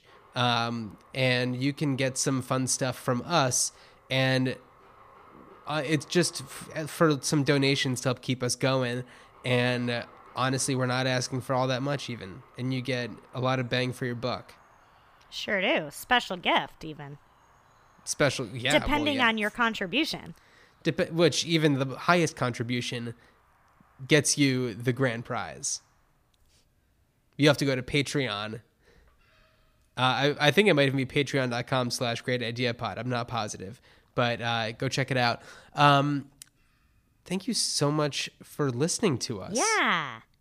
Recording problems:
animal sounds; faint; throughout; 30 dB below the speech

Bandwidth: 15 kHz